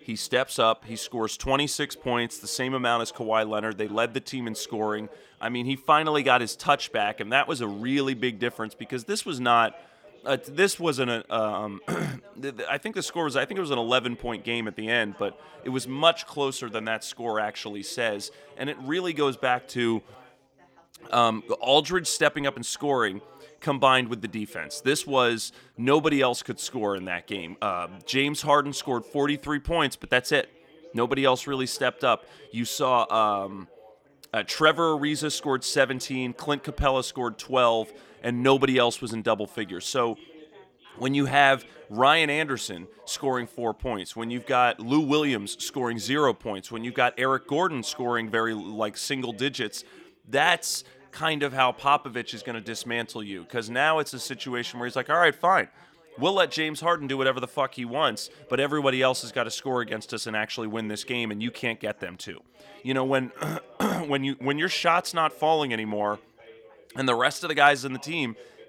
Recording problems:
background chatter; faint; throughout; 3 voices, 25 dB below the speech

